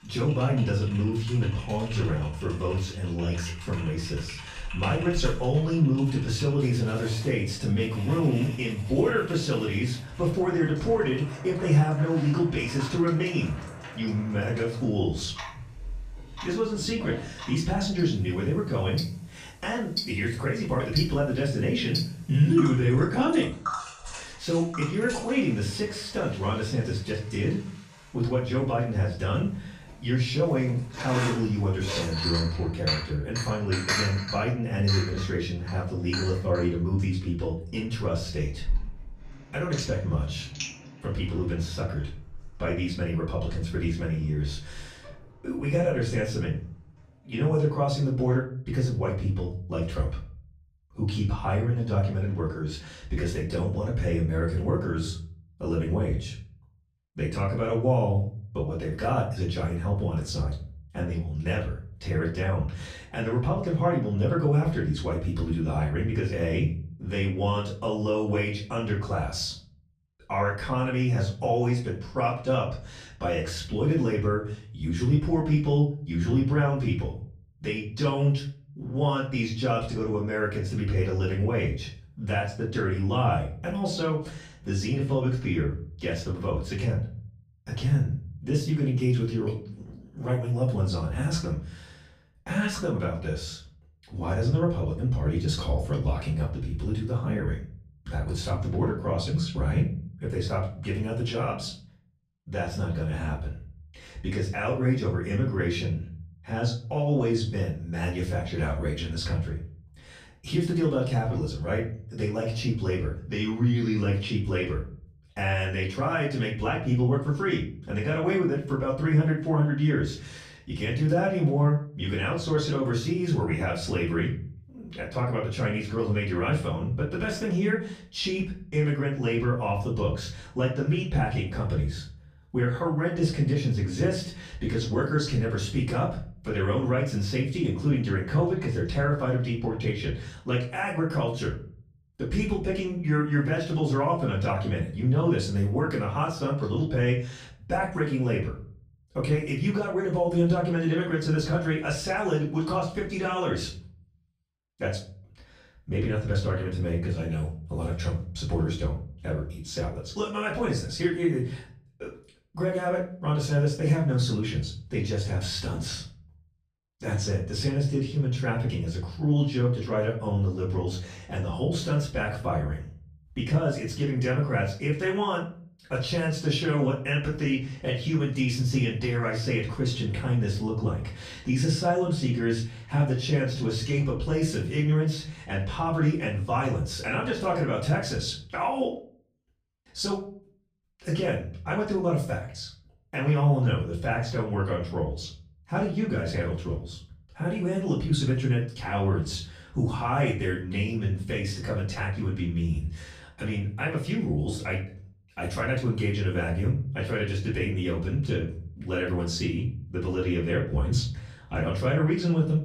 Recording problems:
off-mic speech; far
room echo; slight; dies away in 0.5 s
household noises; loud; until 47 s; 10 dB below the speech

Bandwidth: 14.5 kHz